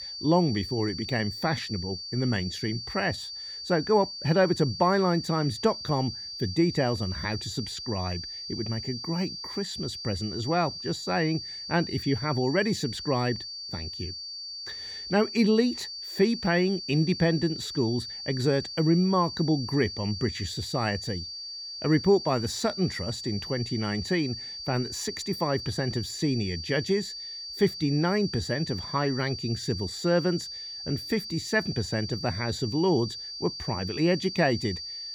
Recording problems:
high-pitched whine; loud; throughout; 4.5 kHz, 7 dB below the speech

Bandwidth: 18 kHz